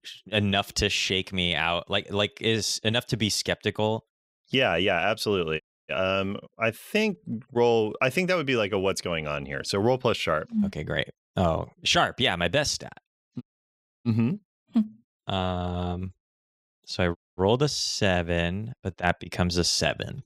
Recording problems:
audio cutting out; at 5.5 s, at 13 s for 0.5 s and at 17 s

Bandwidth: 15.5 kHz